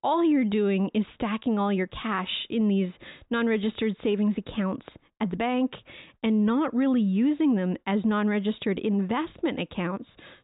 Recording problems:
high frequencies cut off; severe; nothing above 4 kHz

